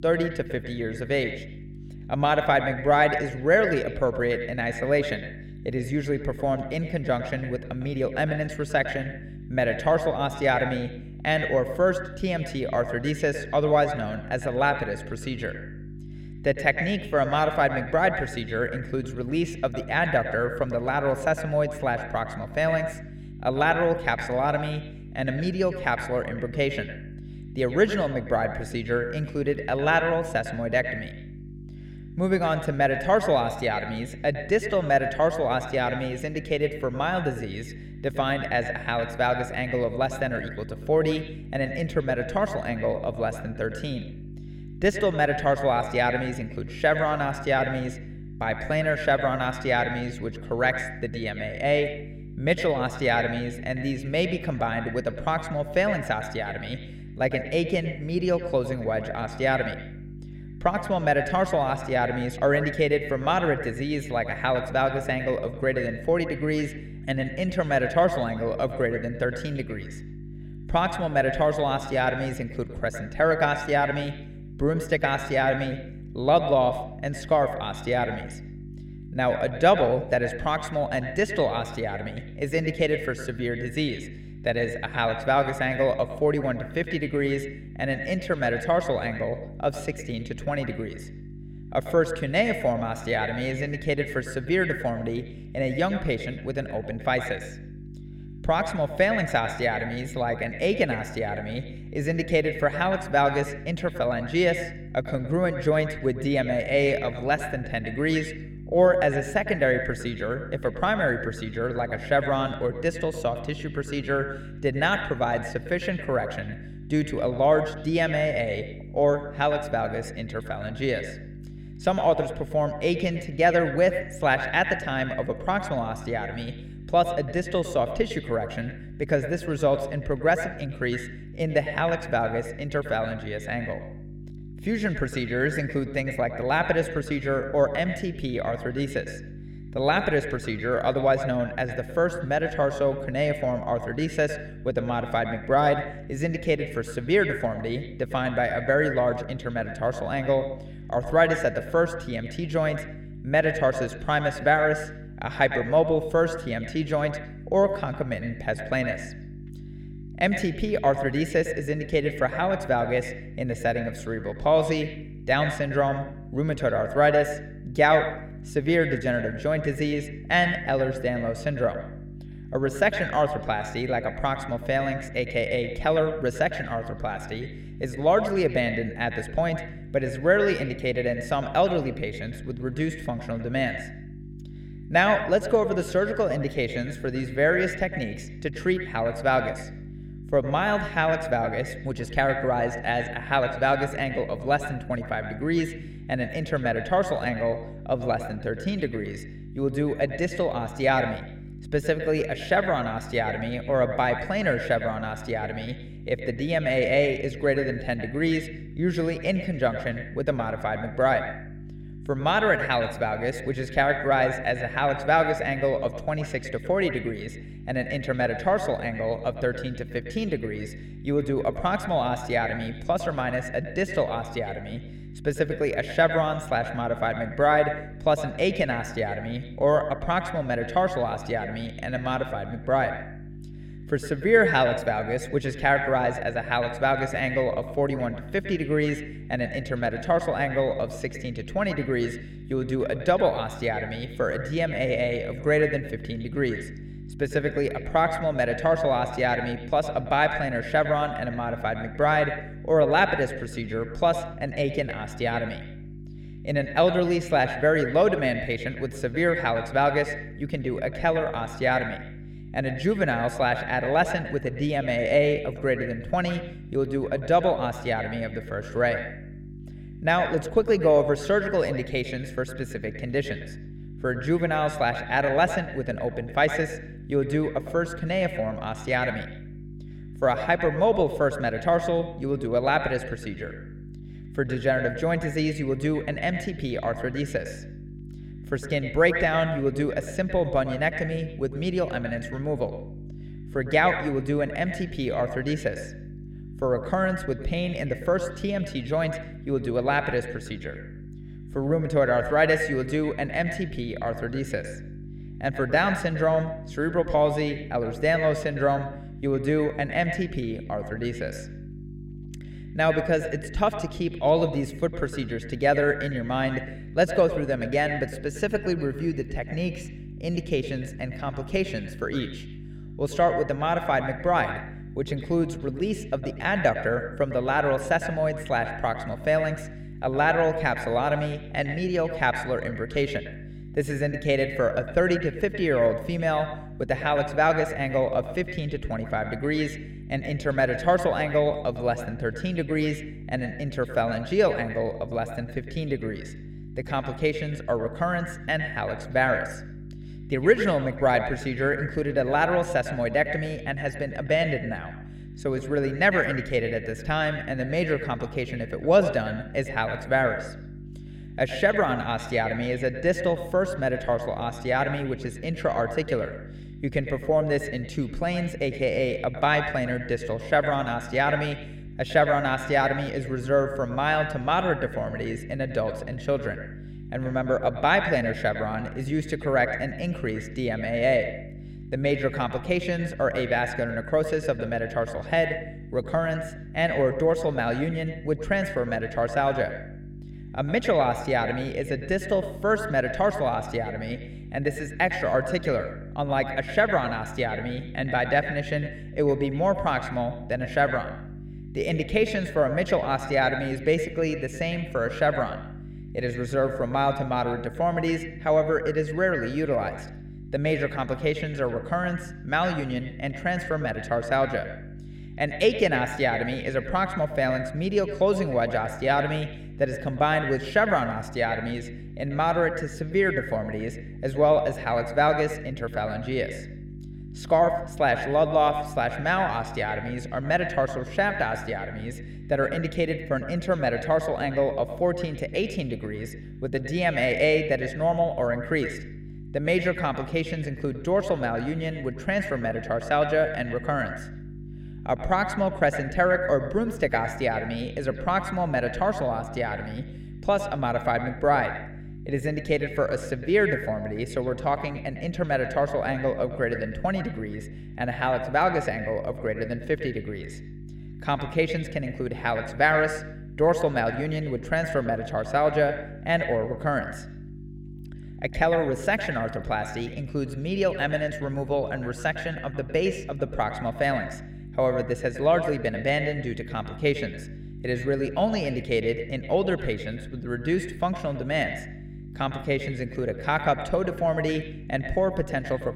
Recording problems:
echo of what is said; strong; throughout; 110 ms later, 9 dB below the speech
electrical hum; faint; throughout; 50 Hz, 25 dB below the speech

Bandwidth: 16 kHz